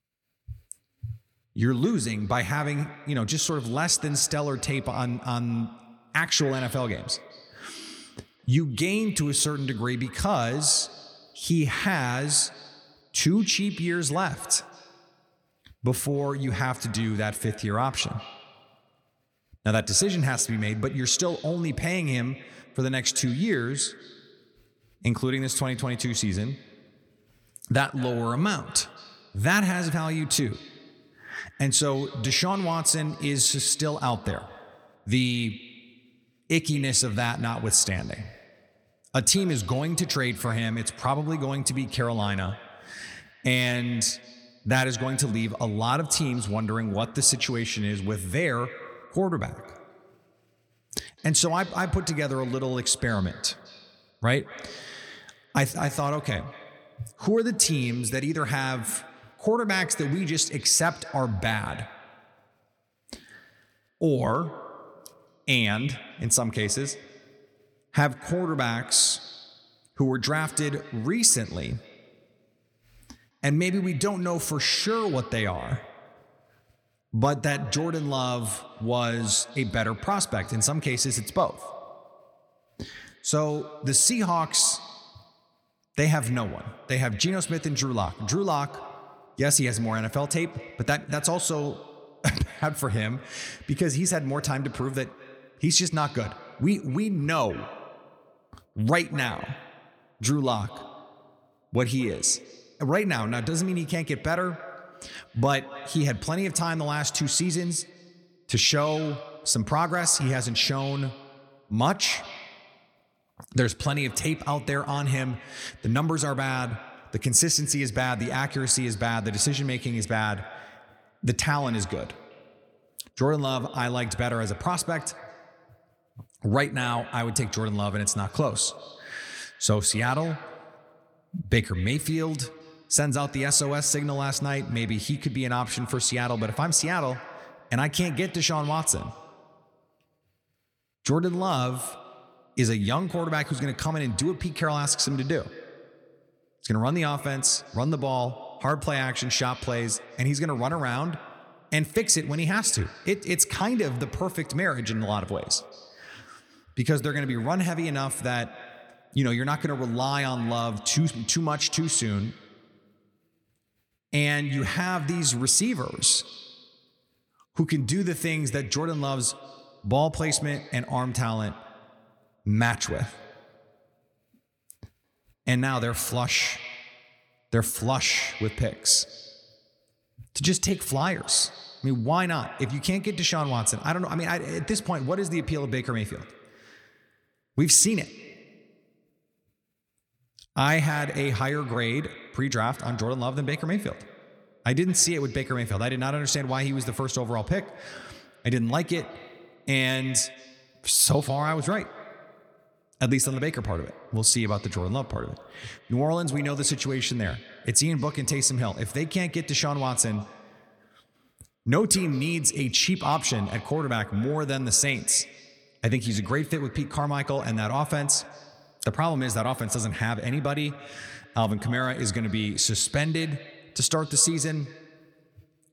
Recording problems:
echo of what is said; faint; throughout; 210 ms later, 20 dB below the speech

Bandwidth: 18 kHz